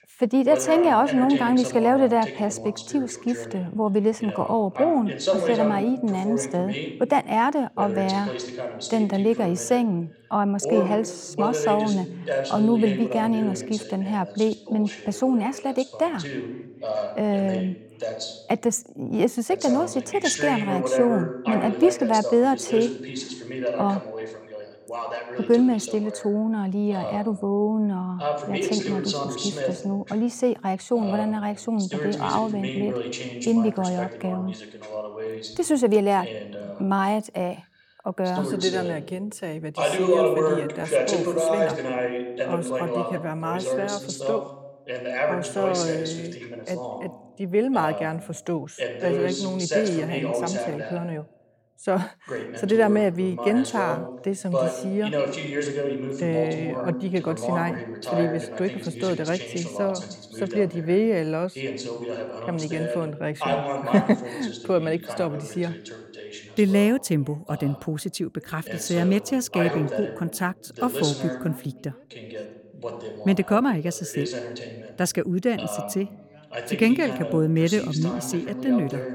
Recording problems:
voice in the background; loud; throughout; 5 dB below the speech

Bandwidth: 17 kHz